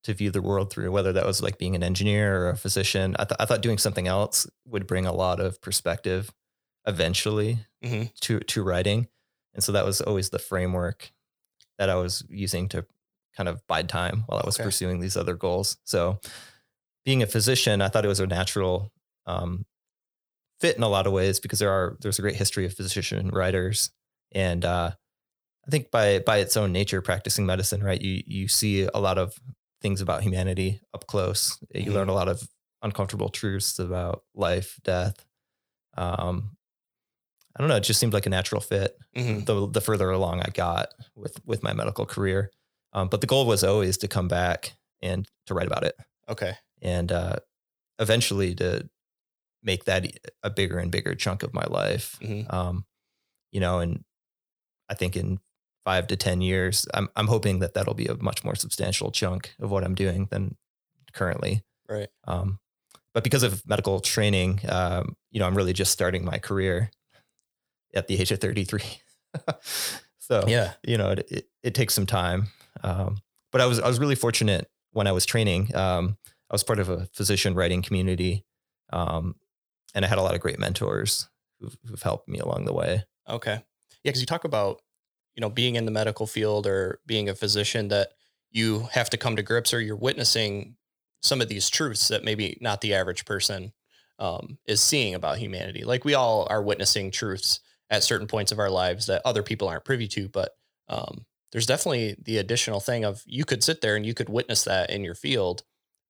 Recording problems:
uneven, jittery; strongly; from 7 s to 1:24

